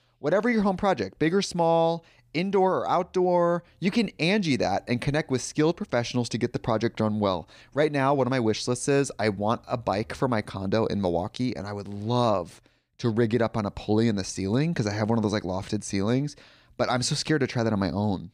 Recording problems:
none

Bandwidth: 15 kHz